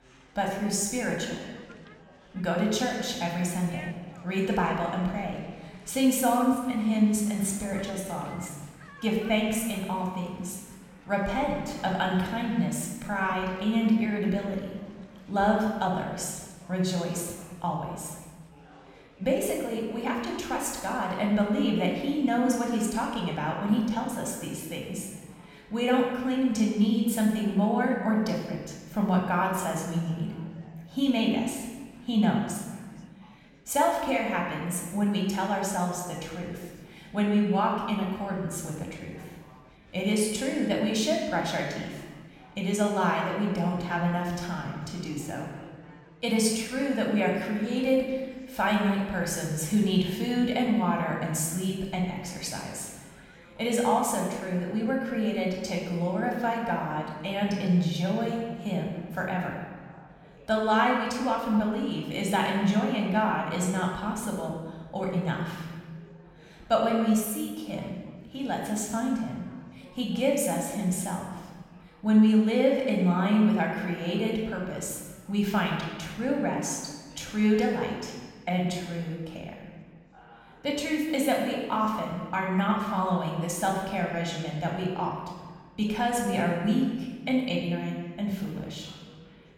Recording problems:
room echo; noticeable; dies away in 1.3 s
off-mic speech; somewhat distant
chatter from many people; faint; throughout; 25 dB below the speech

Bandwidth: 16.5 kHz